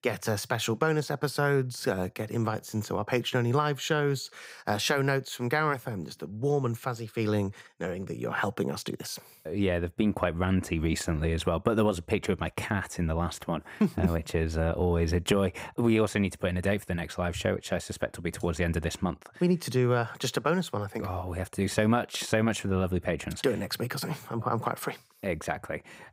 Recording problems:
none

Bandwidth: 15.5 kHz